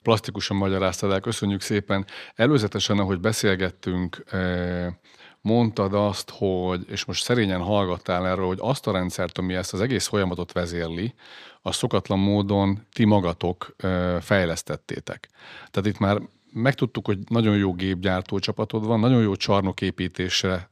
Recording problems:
none

